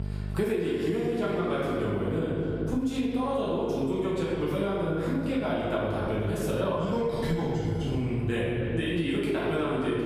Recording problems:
room echo; strong; dies away in 1.5 s
off-mic speech; far
echo of what is said; noticeable; throughout; 290 ms later, 15 dB below the speech
squashed, flat; somewhat
electrical hum; faint; throughout; 50 Hz, 25 dB below the speech

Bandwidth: 15 kHz